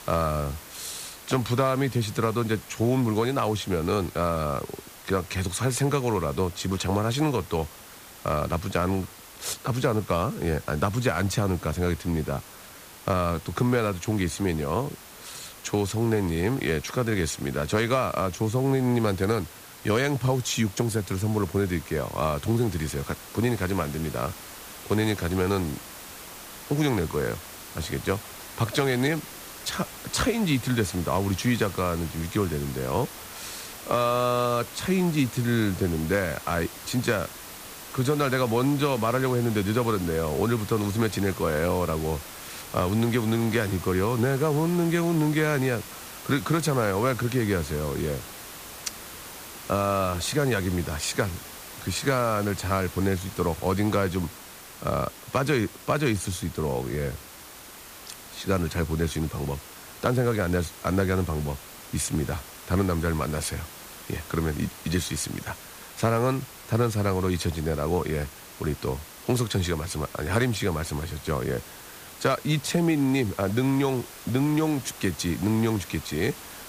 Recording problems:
hiss; noticeable; throughout; 15 dB below the speech

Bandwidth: 15 kHz